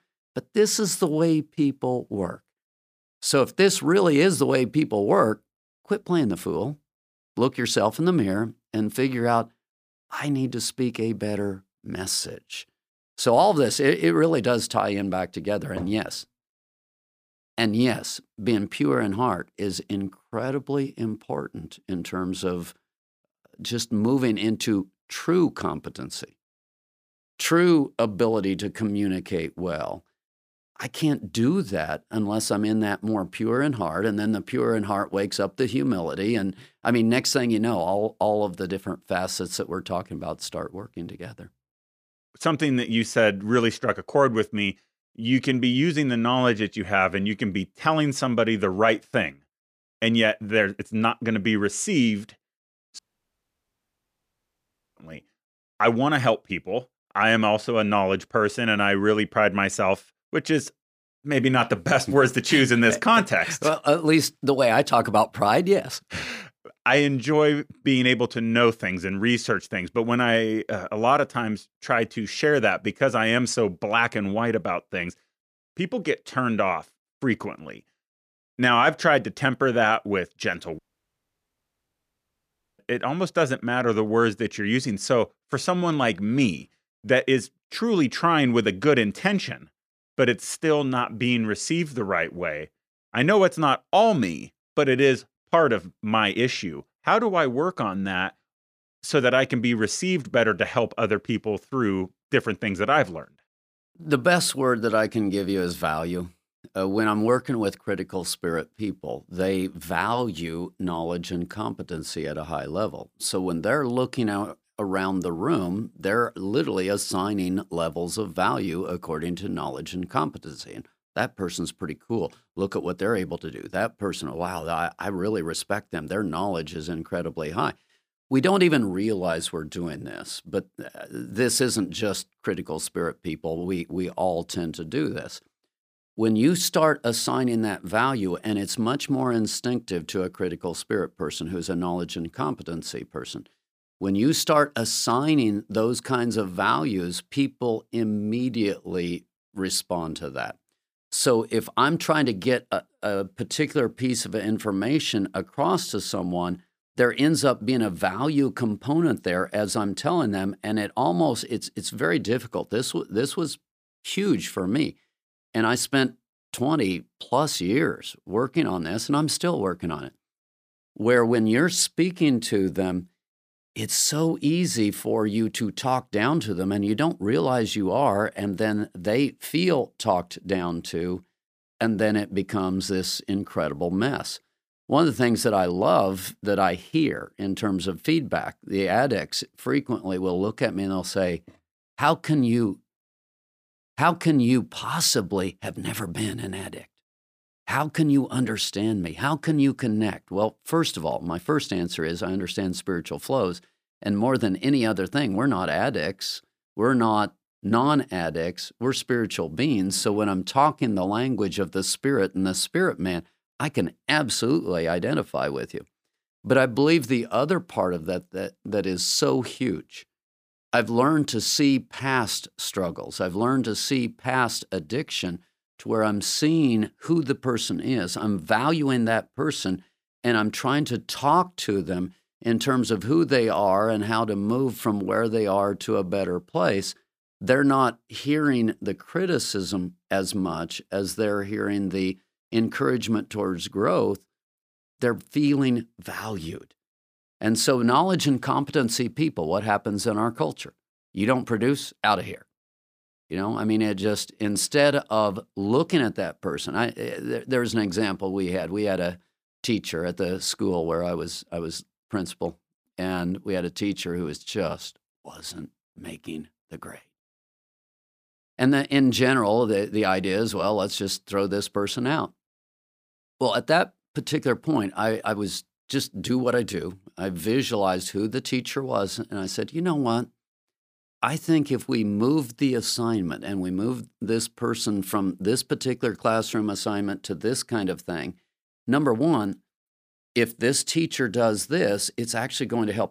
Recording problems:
audio cutting out; at 53 s for 2 s and at 1:21 for 2 s

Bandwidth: 15 kHz